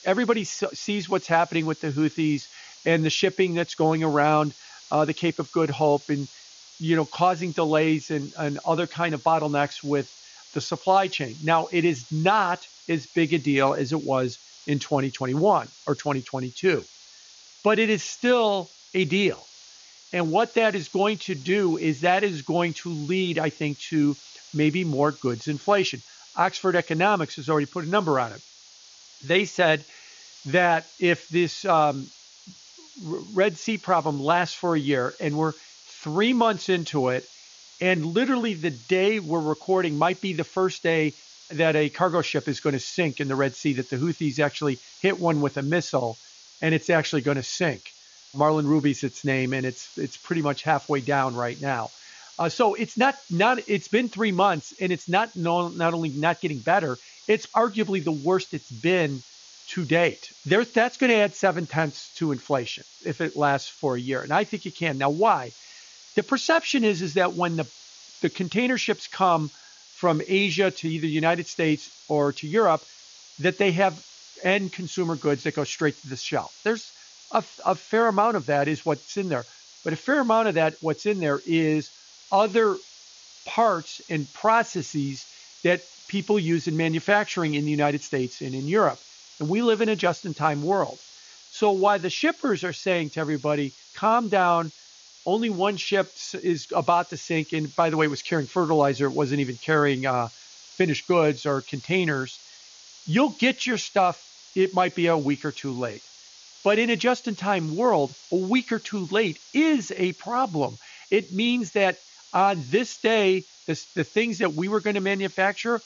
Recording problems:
high frequencies cut off; noticeable; nothing above 7 kHz
hiss; faint; throughout; 20 dB below the speech

